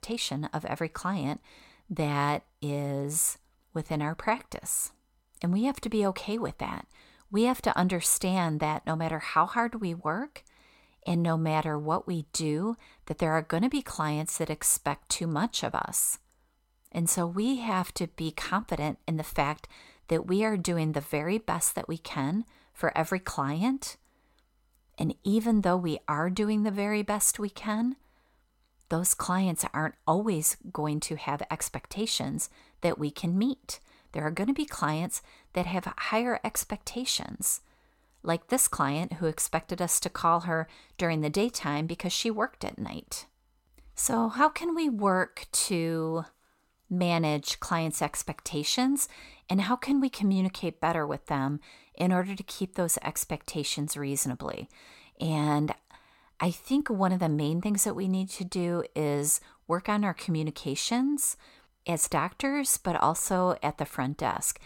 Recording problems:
none

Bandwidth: 16.5 kHz